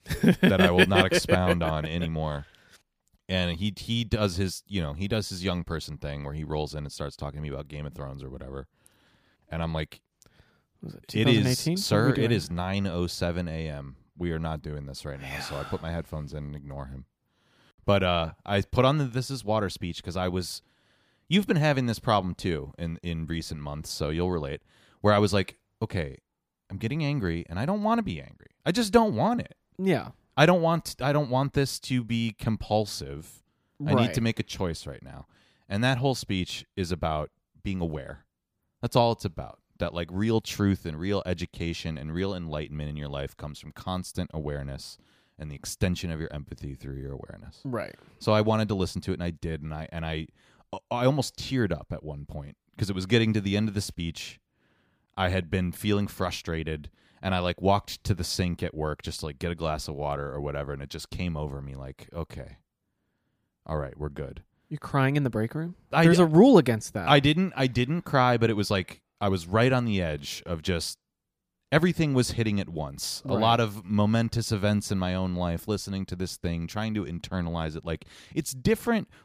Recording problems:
none

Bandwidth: 15 kHz